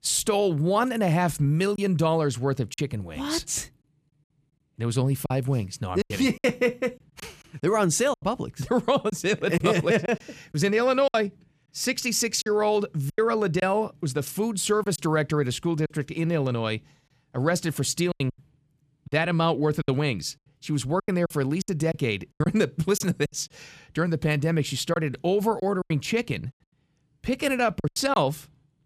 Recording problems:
choppy; very; 7% of the speech affected

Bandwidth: 14.5 kHz